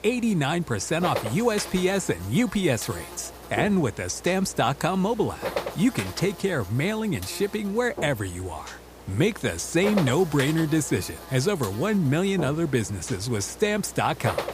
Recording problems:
electrical hum; loud; throughout; 60 Hz, 10 dB below the speech

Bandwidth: 15 kHz